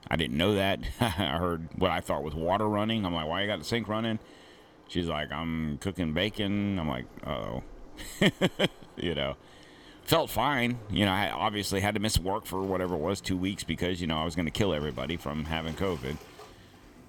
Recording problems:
rain or running water; faint; throughout; 25 dB below the speech

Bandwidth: 18 kHz